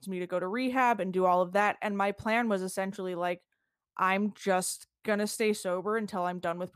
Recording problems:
none

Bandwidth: 15 kHz